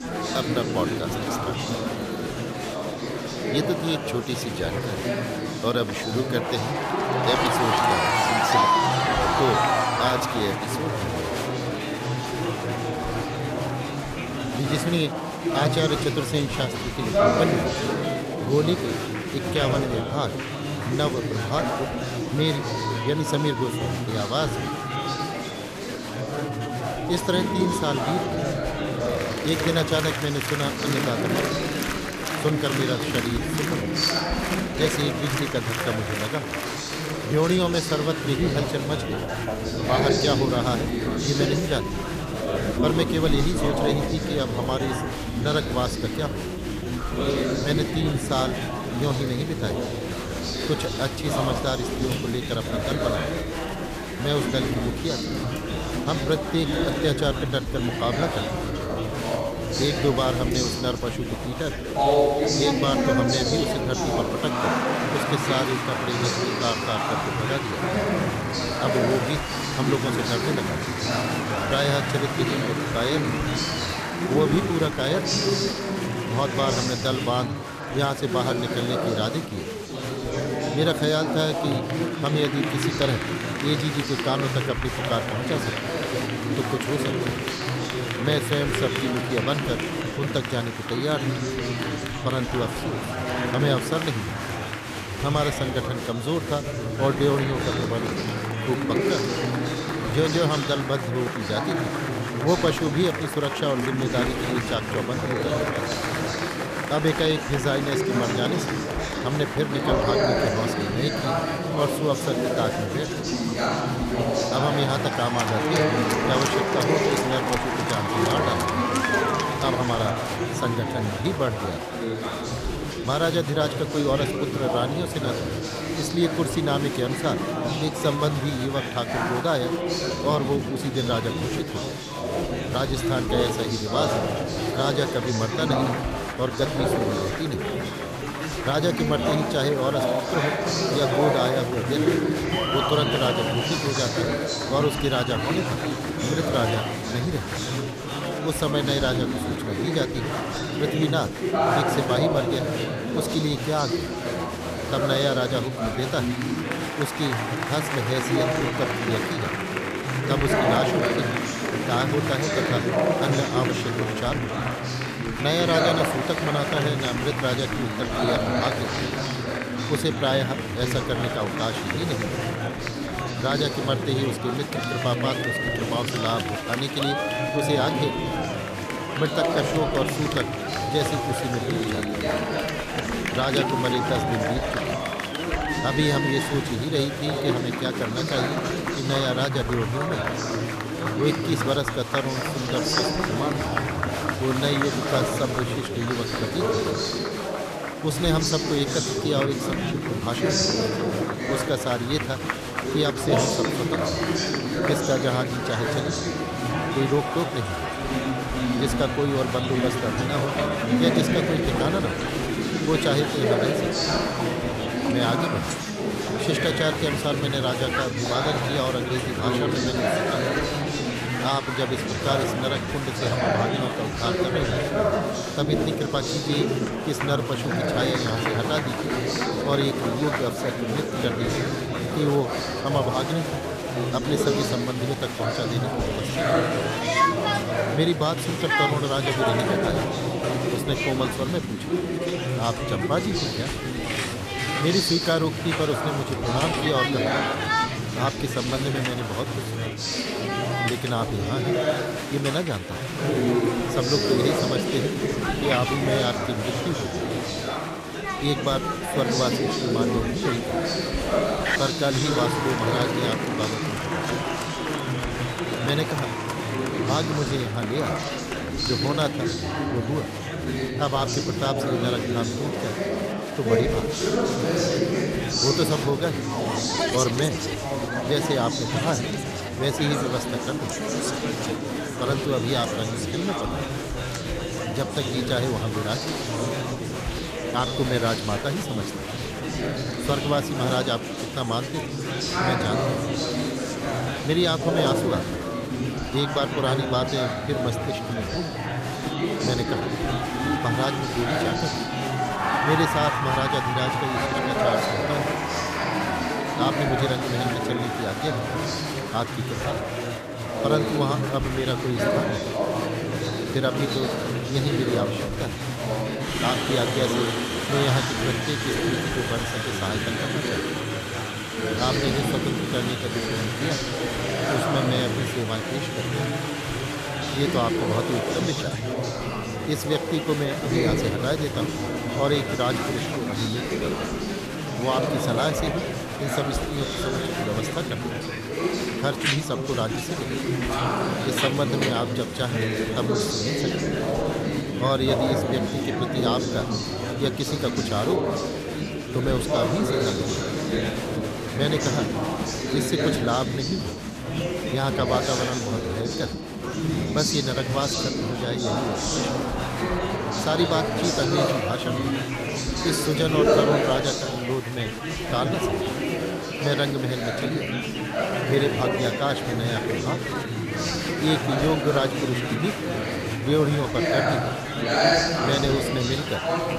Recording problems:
chatter from many people; very loud; throughout; 1 dB above the speech

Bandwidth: 14.5 kHz